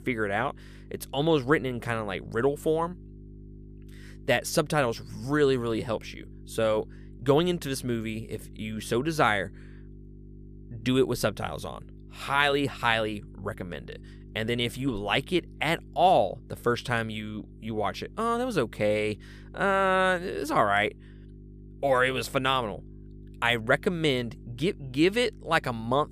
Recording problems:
electrical hum; faint; throughout; 50 Hz, 30 dB below the speech

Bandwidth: 14.5 kHz